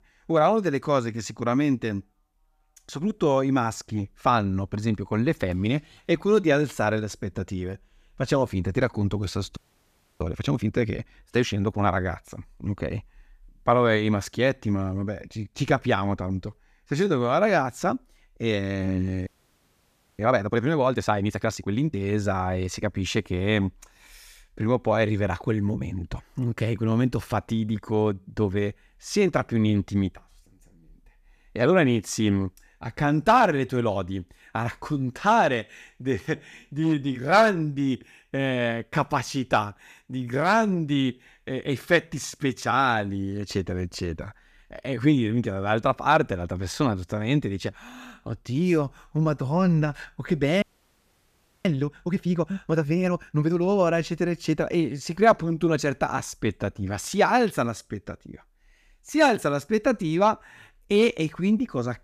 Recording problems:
audio freezing; at 9.5 s for 0.5 s, at 19 s for 1 s and at 51 s for 1 s

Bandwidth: 14.5 kHz